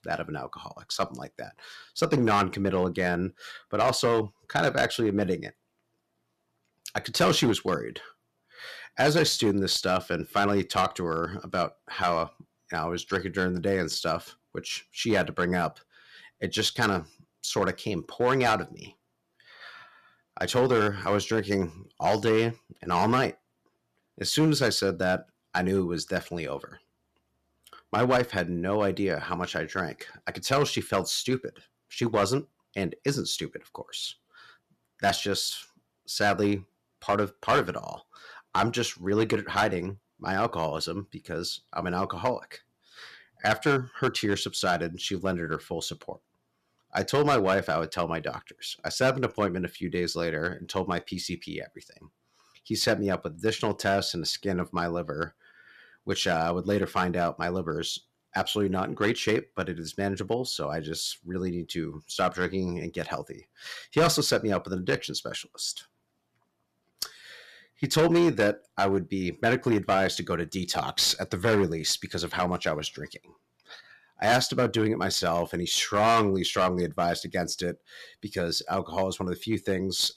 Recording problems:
distortion; slight; 3% of the sound clipped

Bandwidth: 14 kHz